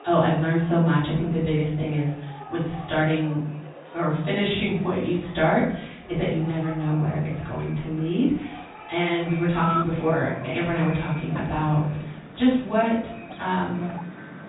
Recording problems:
off-mic speech; far
high frequencies cut off; severe; nothing above 4 kHz
room echo; noticeable; dies away in 0.6 s
echo of what is said; faint; from 7 s on; 110 ms later, 20 dB below the speech
animal sounds; noticeable; throughout; 15 dB below the speech

